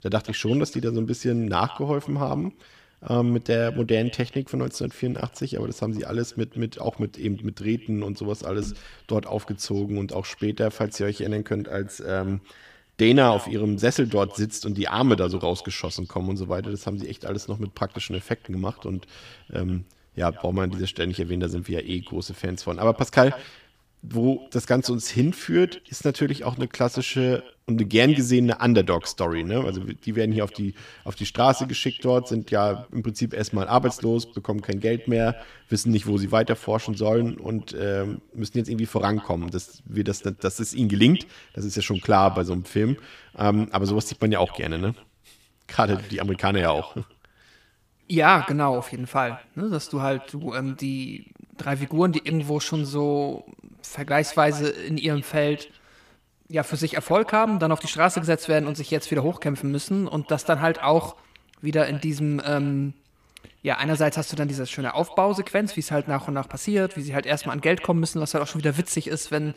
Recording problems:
echo of what is said; faint; throughout; 130 ms later, 20 dB below the speech

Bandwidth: 15 kHz